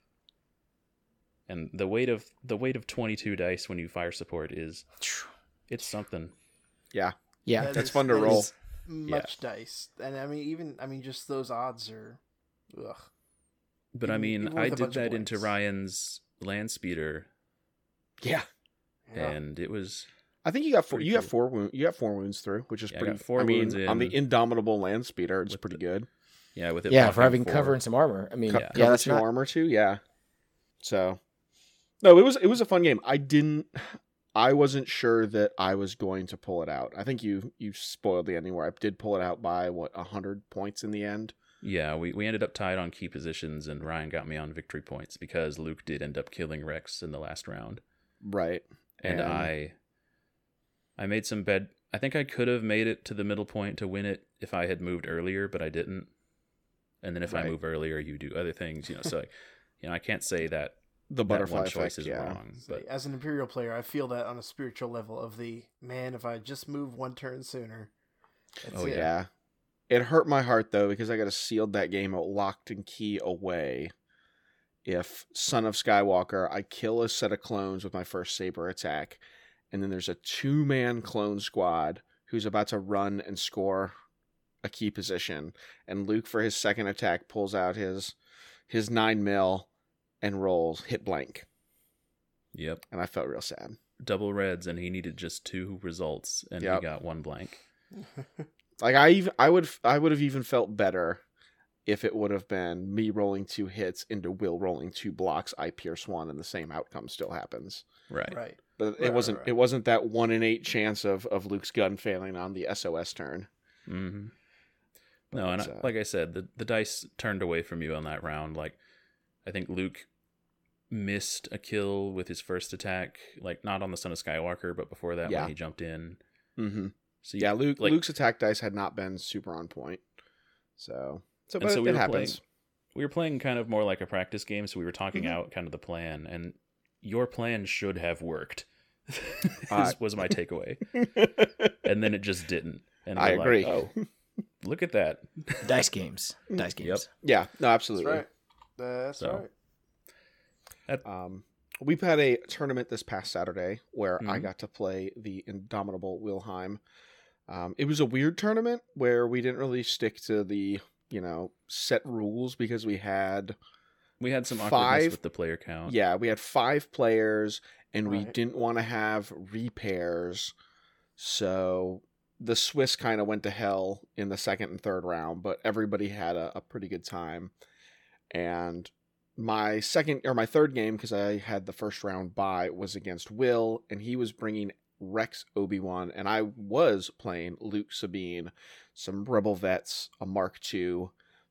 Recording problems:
none

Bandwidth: 17.5 kHz